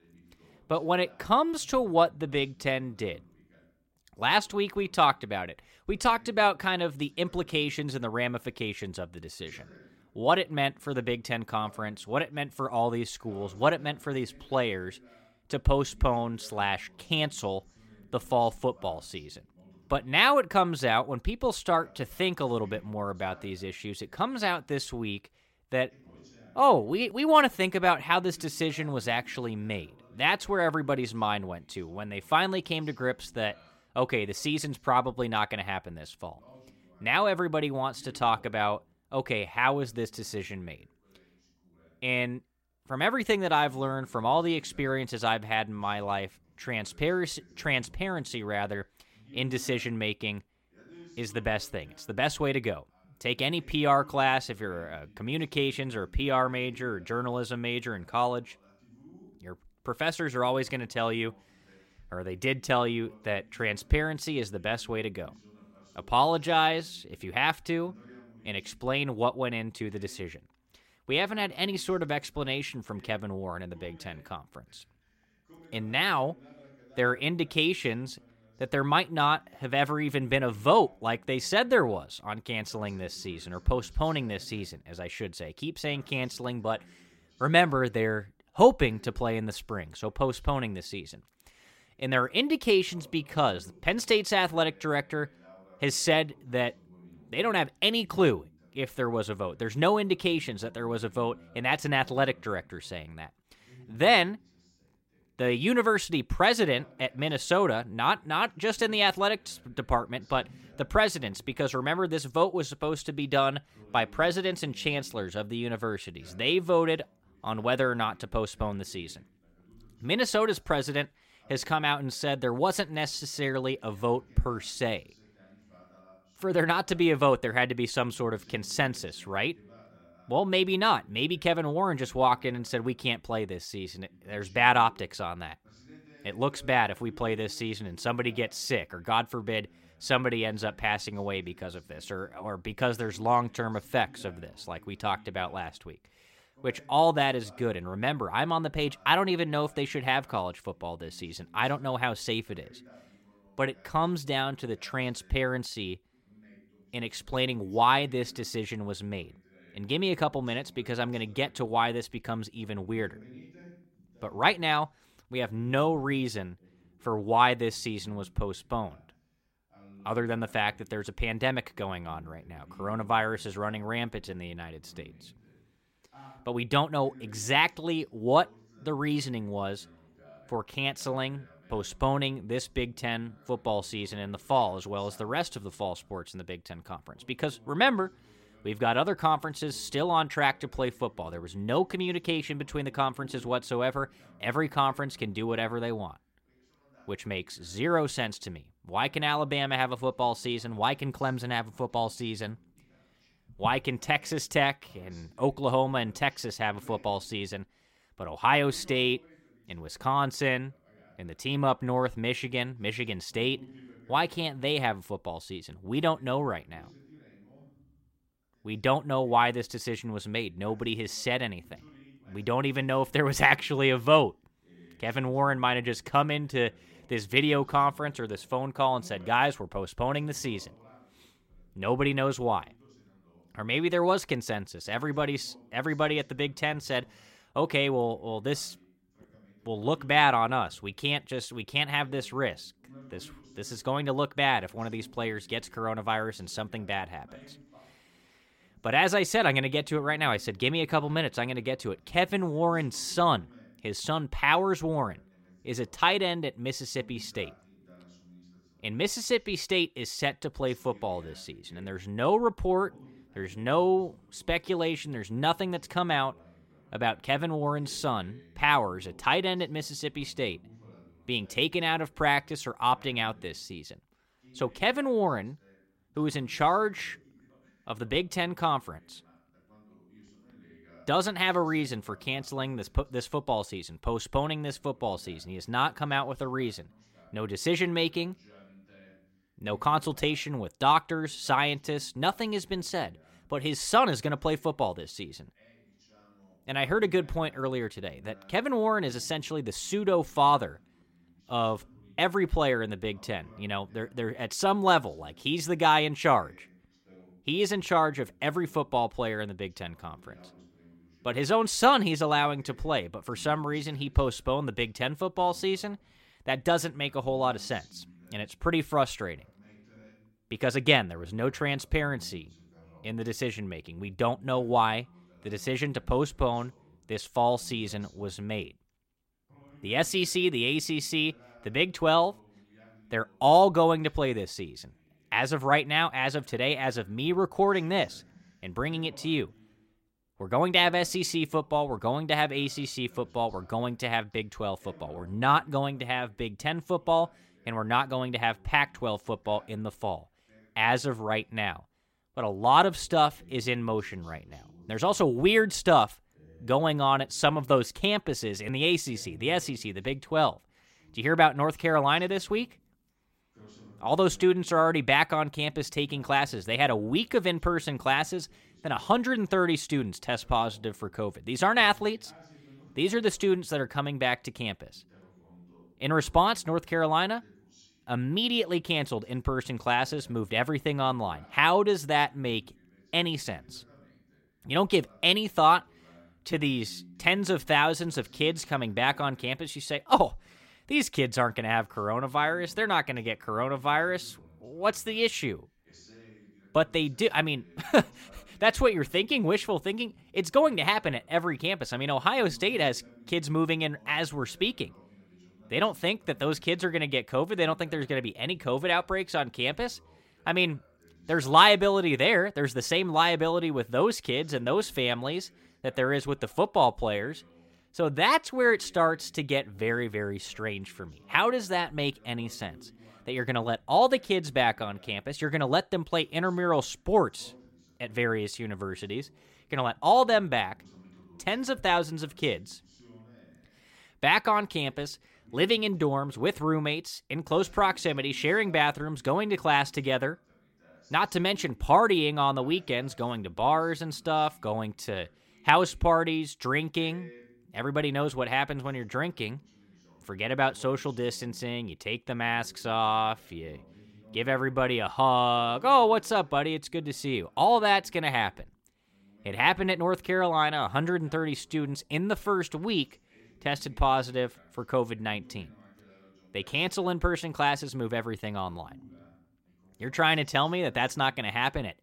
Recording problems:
voice in the background; faint; throughout; 30 dB below the speech

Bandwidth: 16 kHz